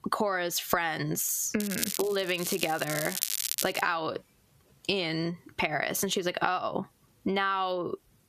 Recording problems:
squashed, flat; heavily
crackling; loud; from 1.5 to 4 s; 3 dB below the speech

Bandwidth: 14.5 kHz